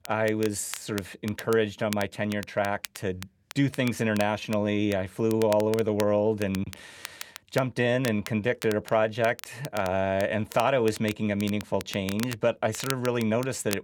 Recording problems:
crackle, like an old record; noticeable; 15 dB below the speech

